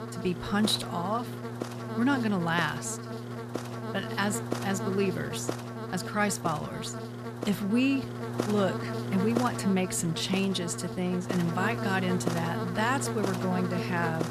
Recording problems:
electrical hum; loud; throughout; 60 Hz, 6 dB below the speech

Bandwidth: 14 kHz